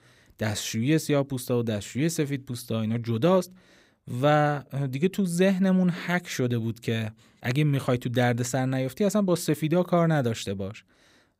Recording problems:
none

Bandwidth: 15.5 kHz